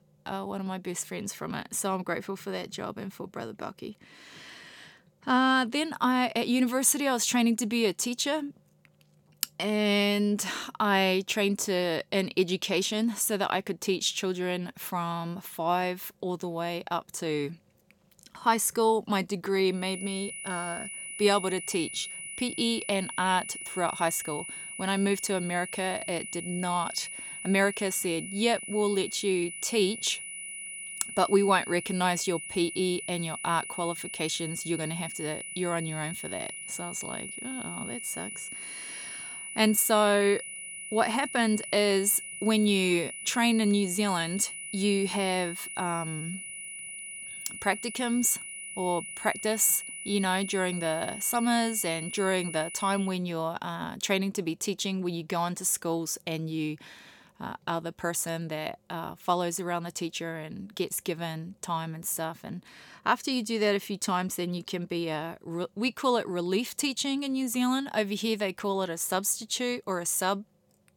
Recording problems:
high-pitched whine; loud; from 20 to 53 s; 2 kHz, 8 dB below the speech

